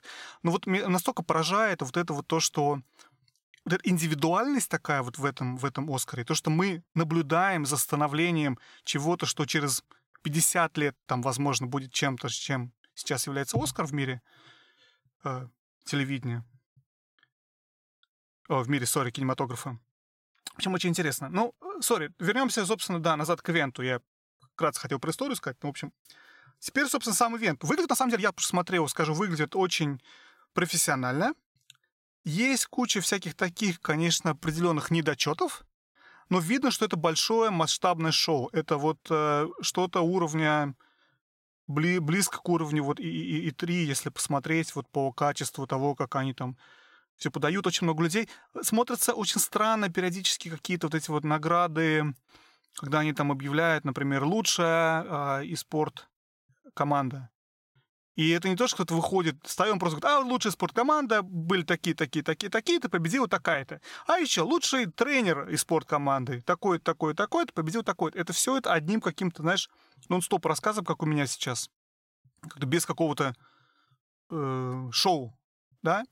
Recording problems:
uneven, jittery; strongly; from 12 s to 1:15

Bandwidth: 16.5 kHz